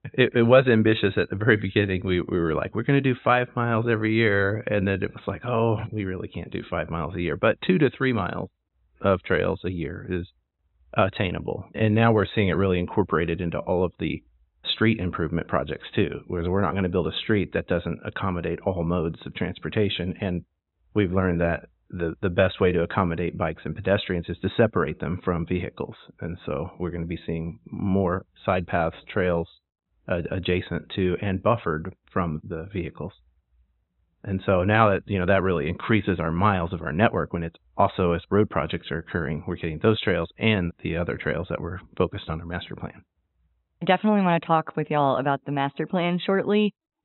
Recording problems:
high frequencies cut off; severe; nothing above 4 kHz

